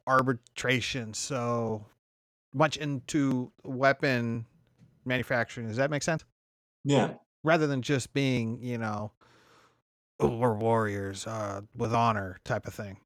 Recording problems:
uneven, jittery; strongly; from 0.5 to 12 s

